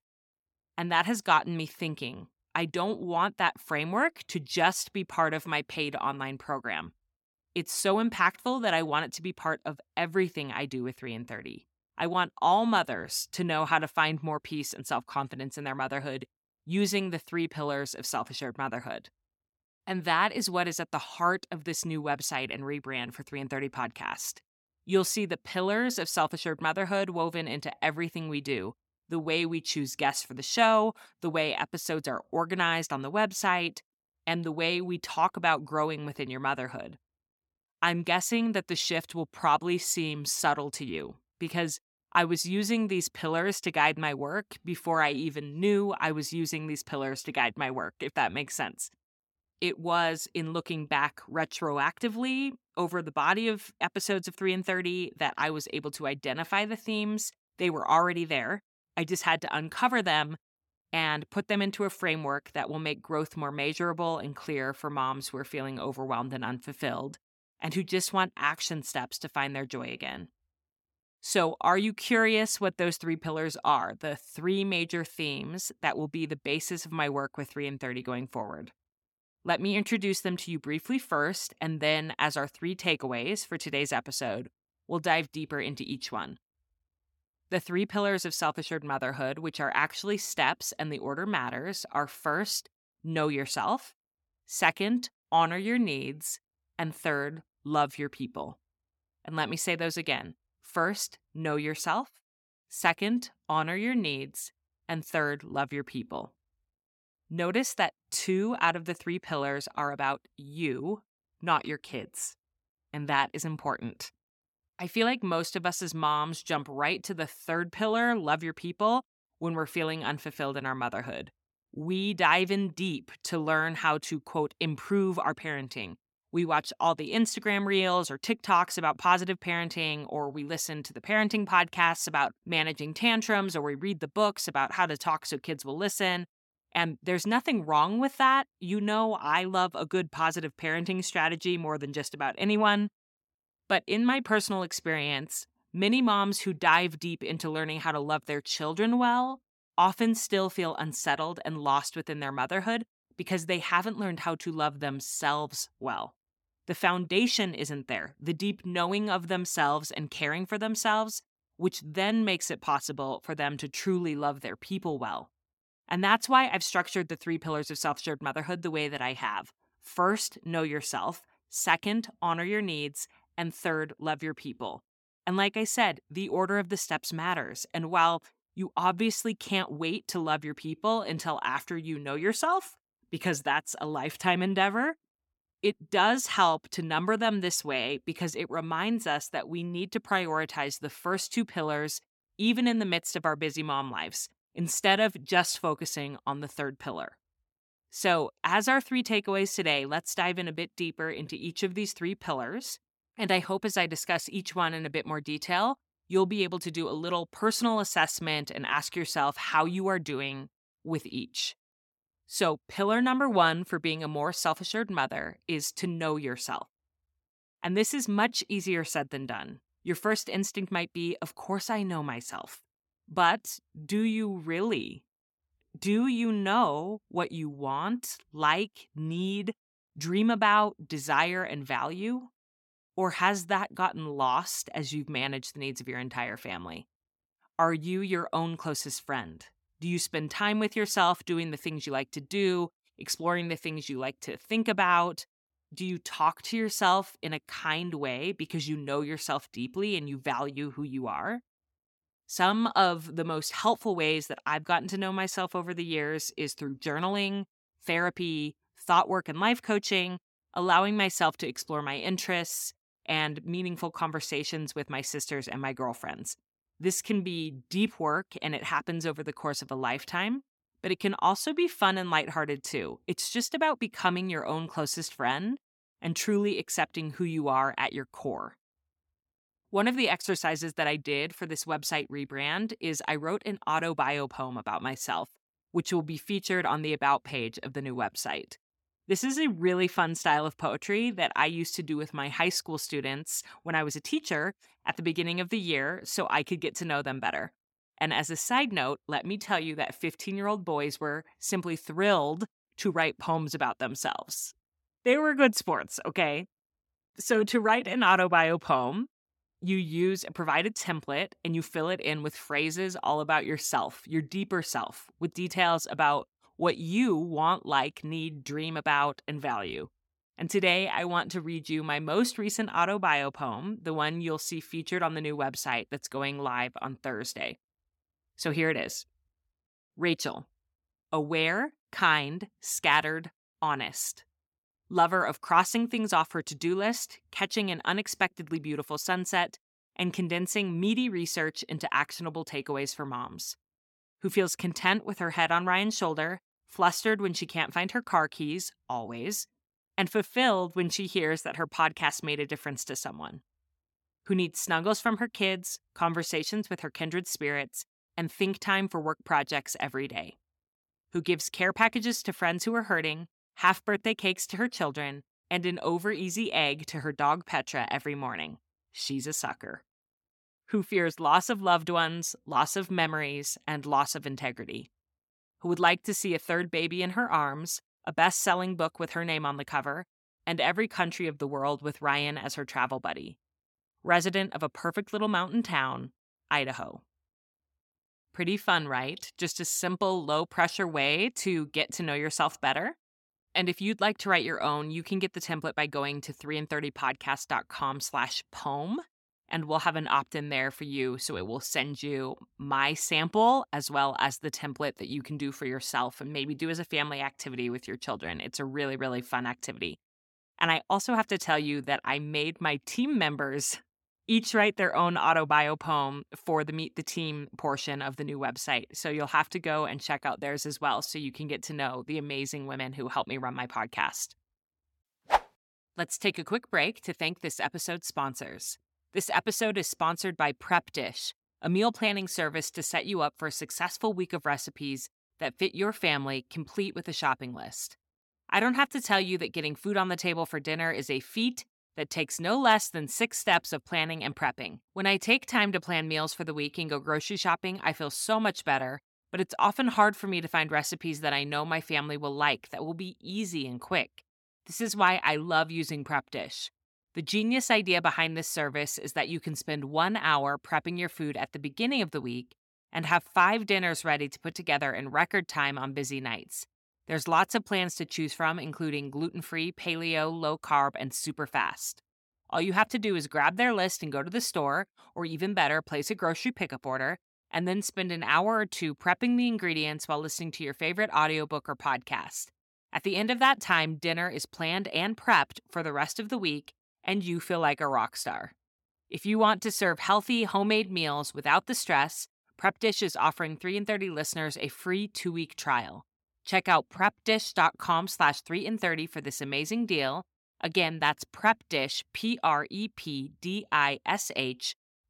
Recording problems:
none

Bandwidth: 17 kHz